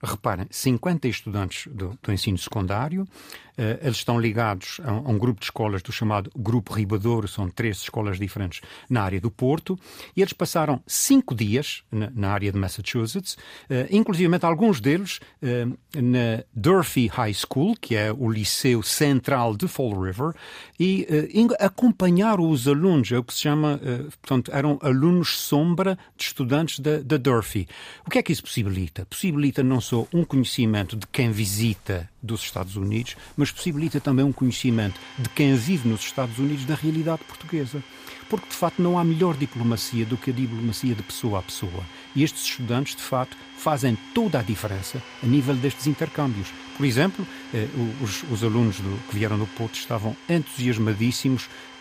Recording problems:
household noises; noticeable; from 30 s on; 15 dB below the speech

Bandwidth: 15 kHz